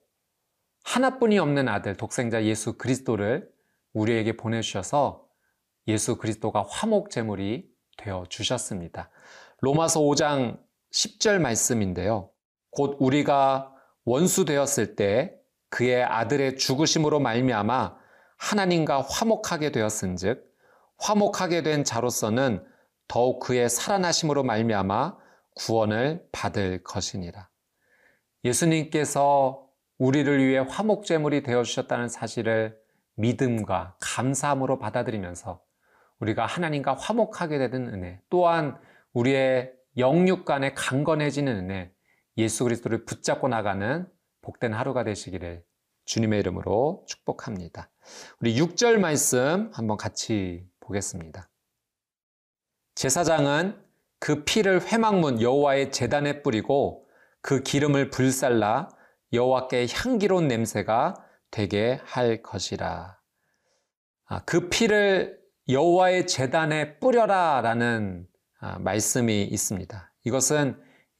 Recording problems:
none

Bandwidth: 15 kHz